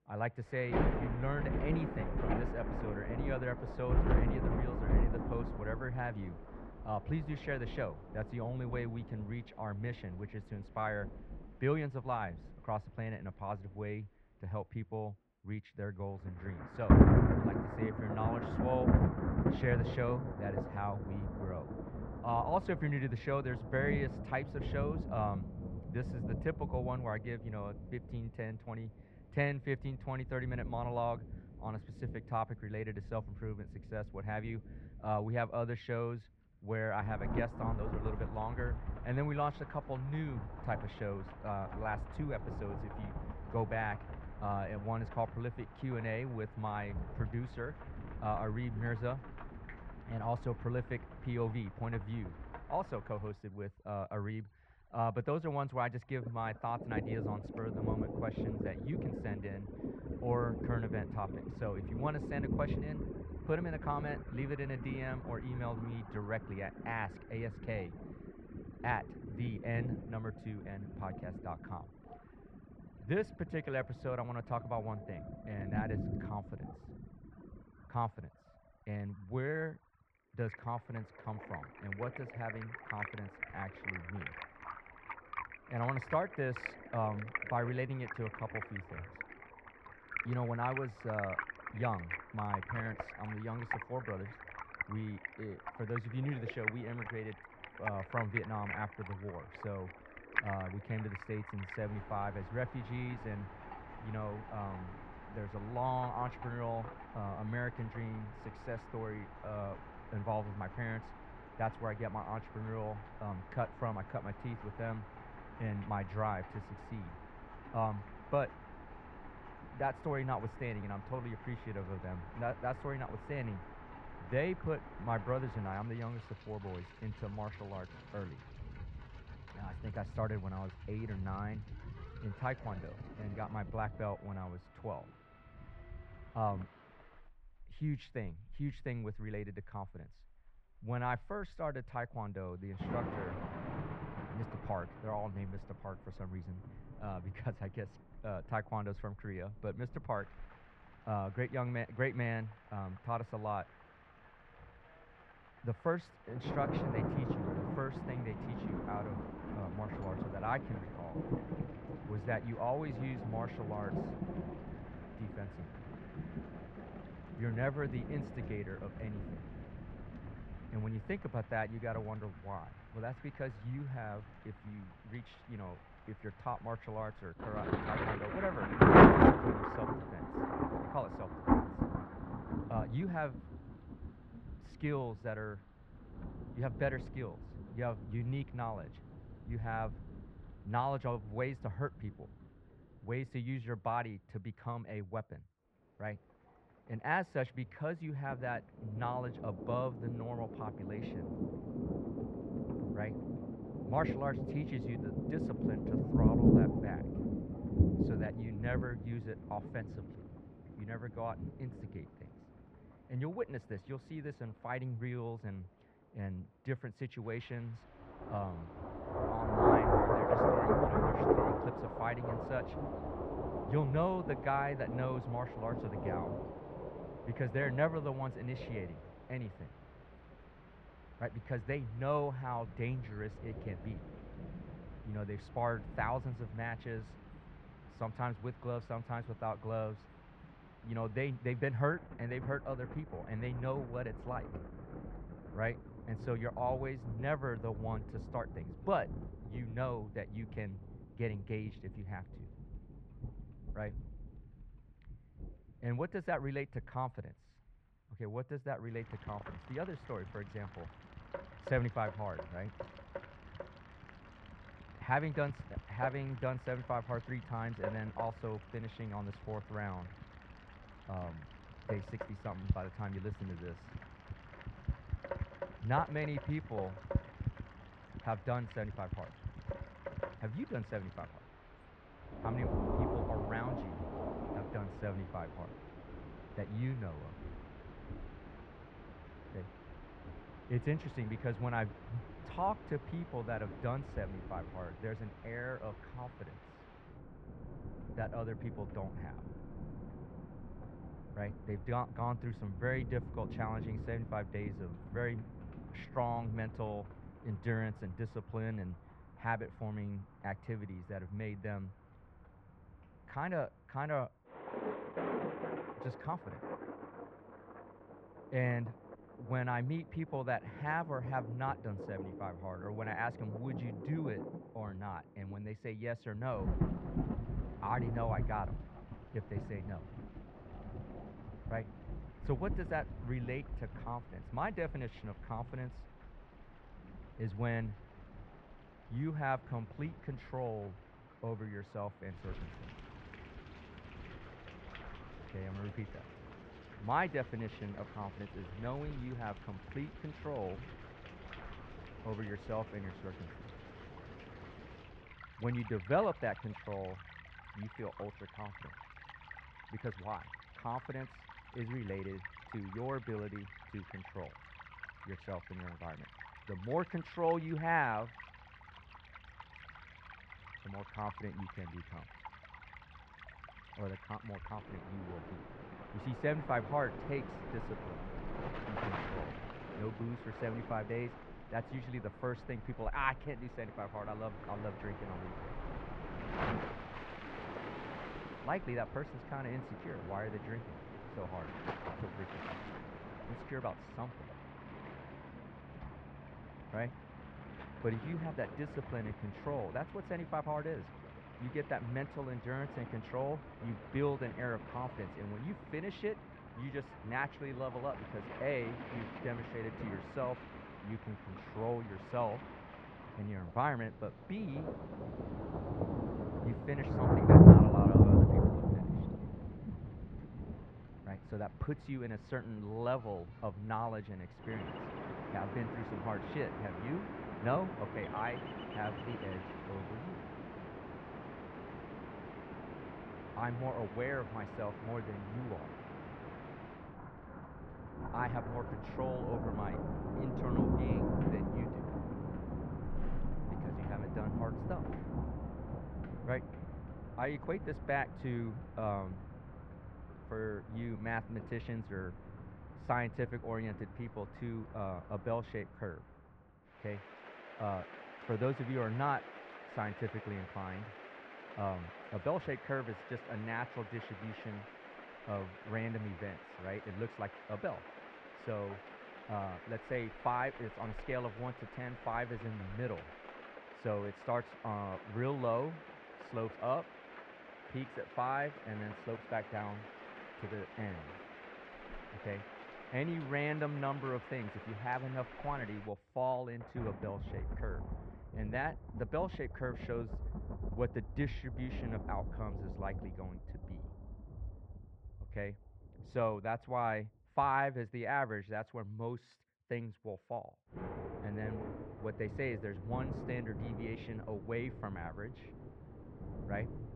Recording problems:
muffled; very; fading above 2 kHz
rain or running water; very loud; throughout; 2 dB above the speech

